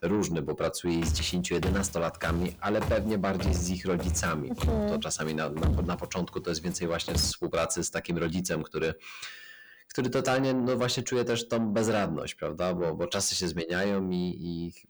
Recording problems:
distortion; heavy; 8 dB below the speech
footsteps; loud; from 1 to 7.5 s; peak level with the speech

